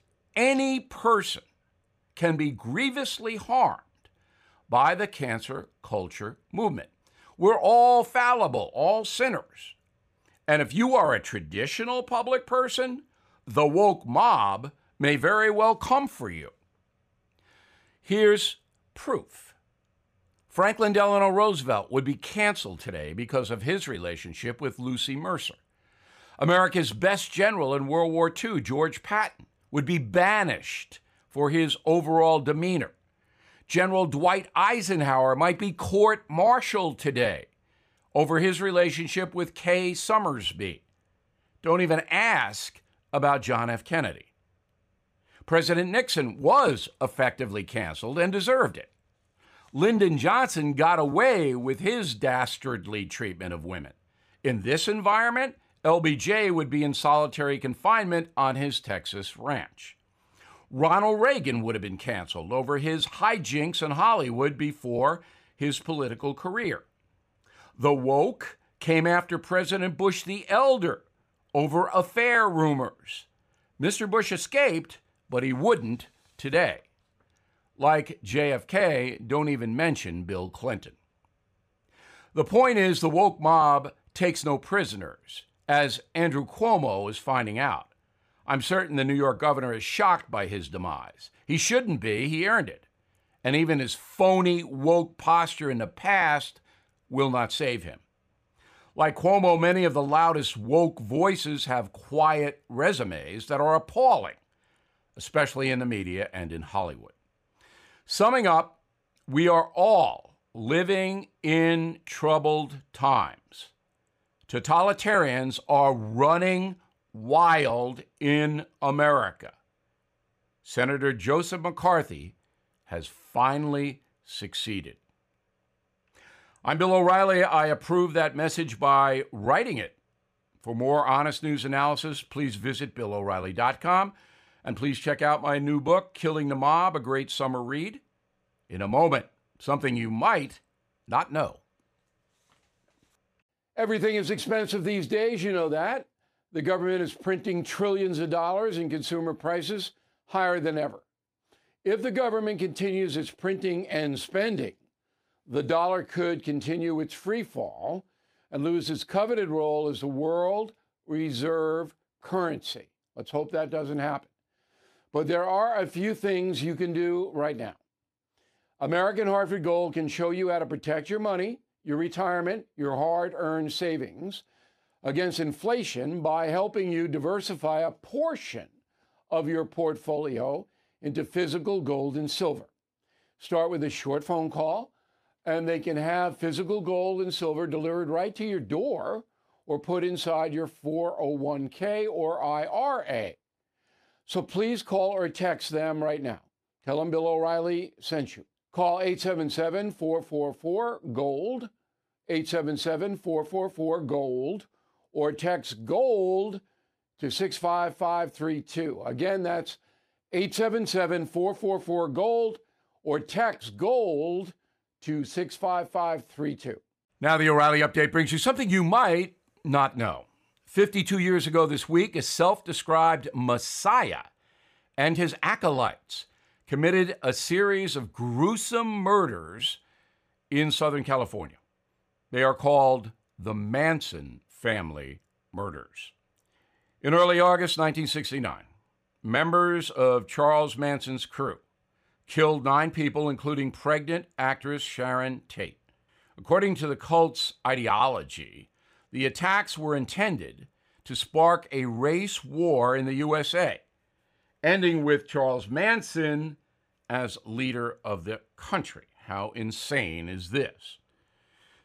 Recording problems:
none

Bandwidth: 15 kHz